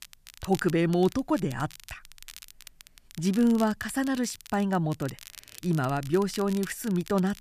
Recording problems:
crackle, like an old record; noticeable; 20 dB below the speech

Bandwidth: 14.5 kHz